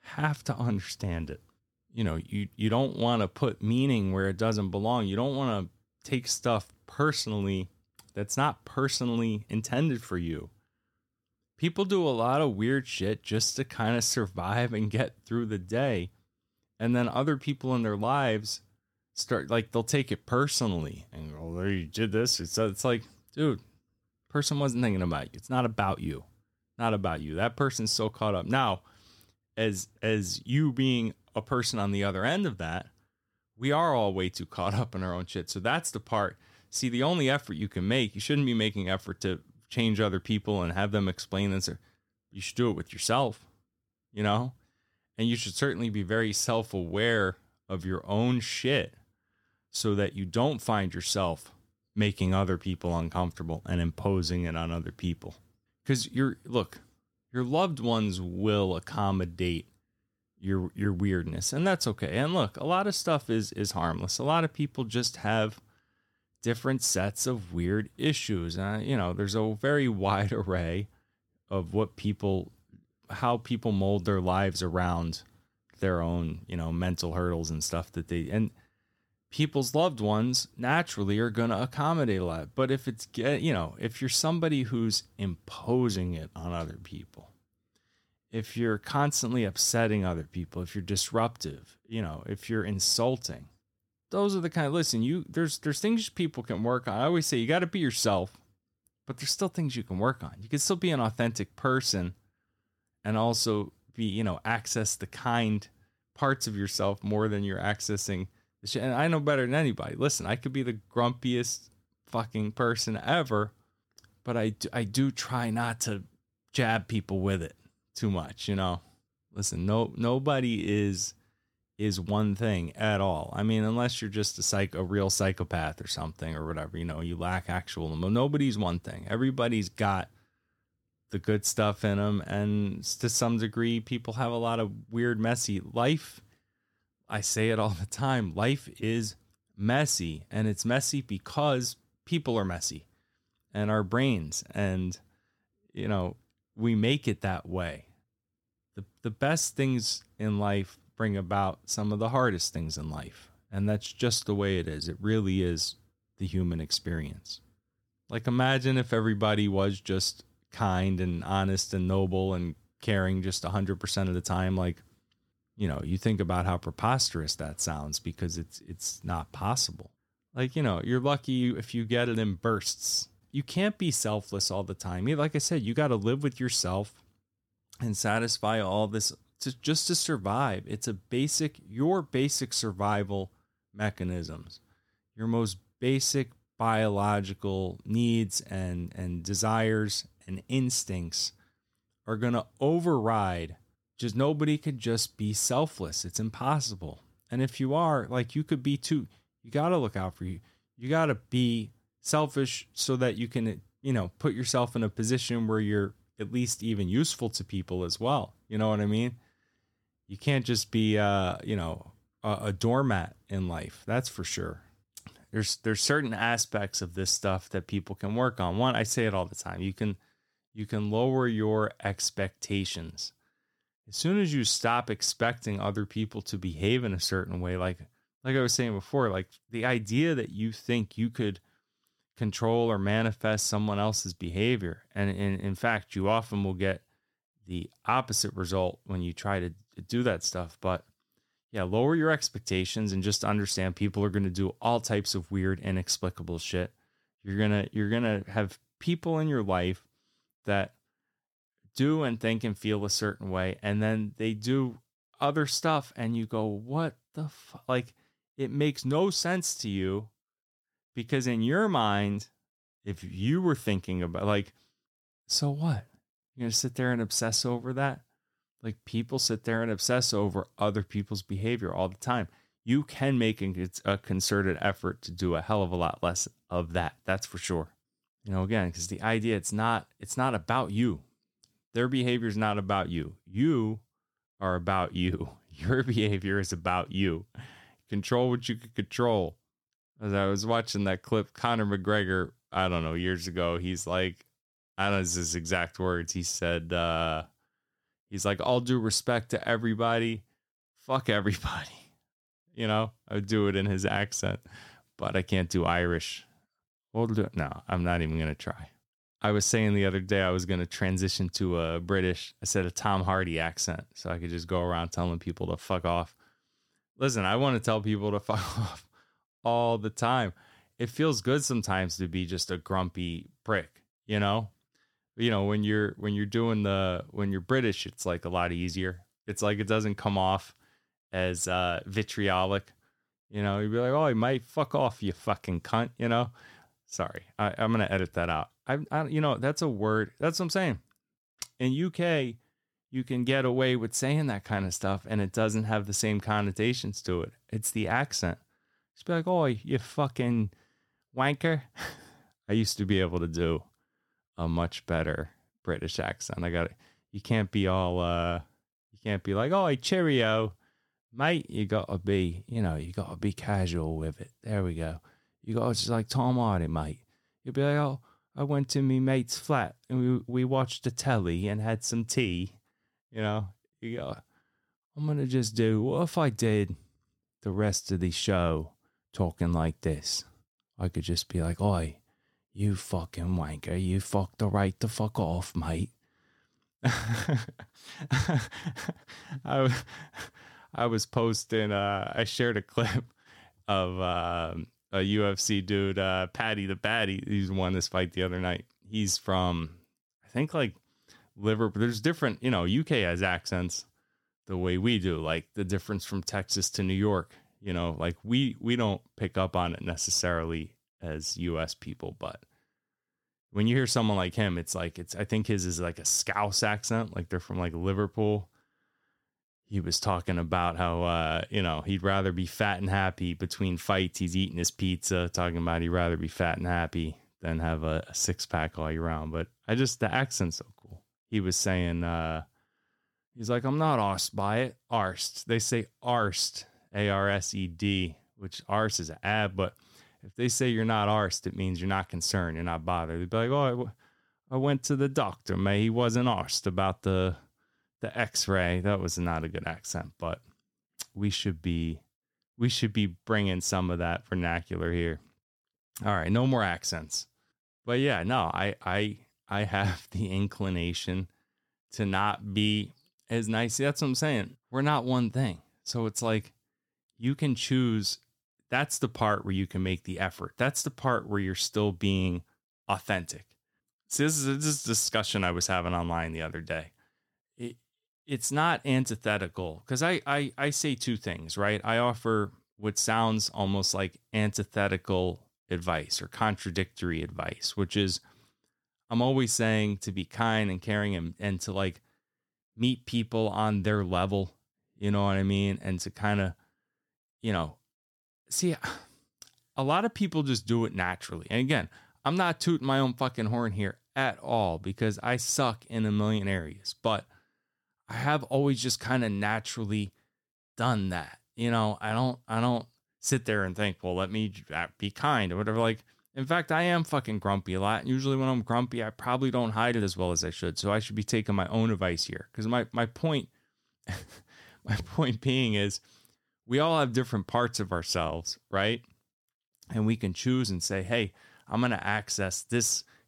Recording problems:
none

